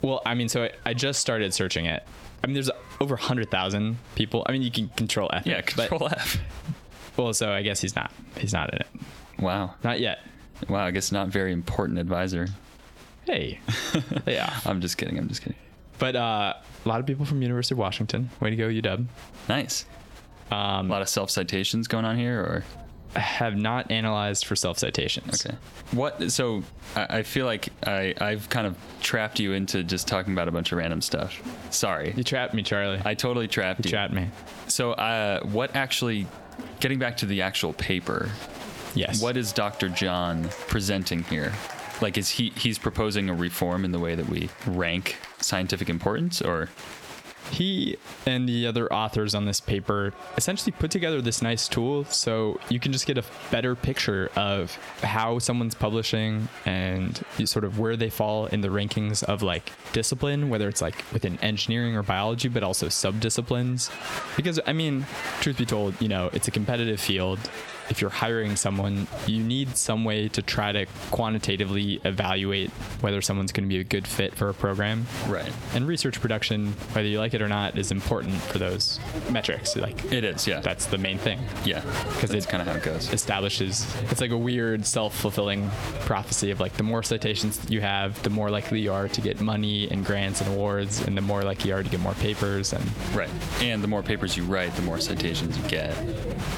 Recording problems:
squashed, flat; somewhat, background pumping
crowd noise; noticeable; throughout; 15 dB below the speech

